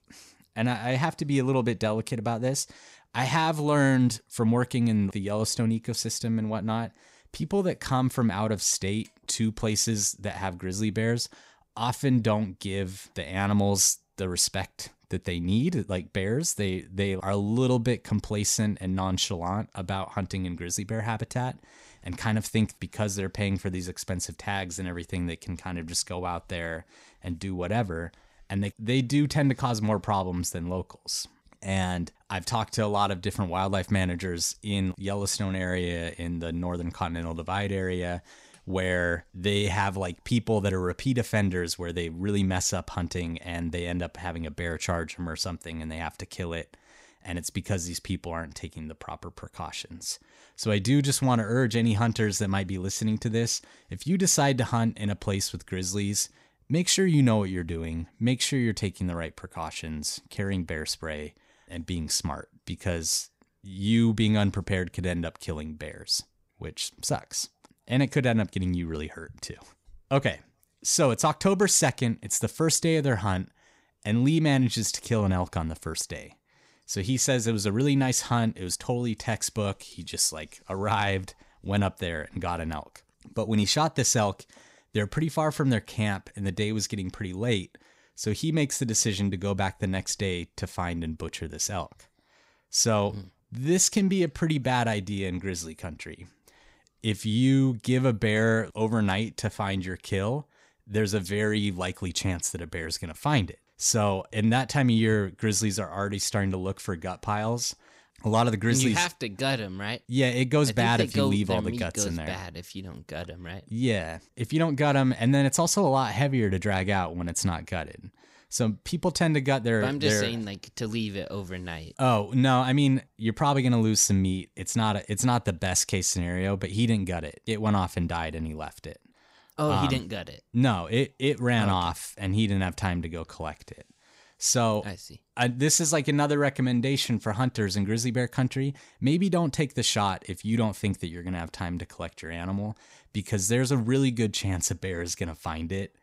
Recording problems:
none

